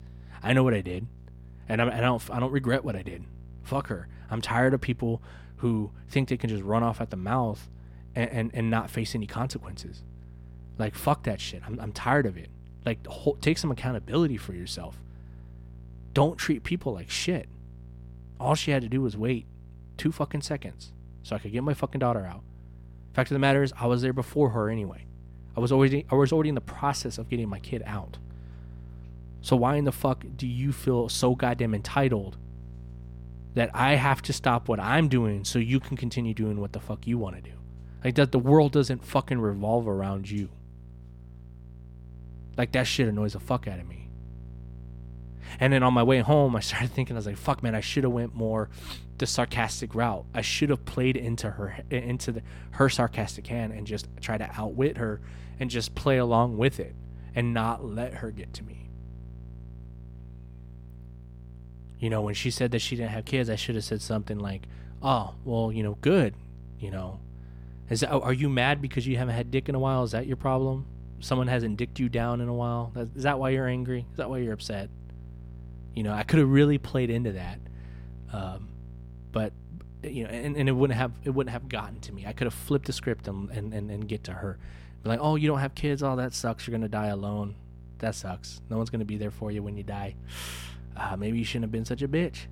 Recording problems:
electrical hum; faint; throughout; 60 Hz, 30 dB below the speech

